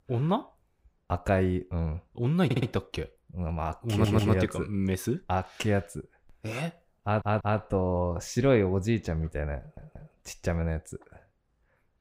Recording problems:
audio stuttering; 4 times, first at 2.5 s

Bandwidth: 15.5 kHz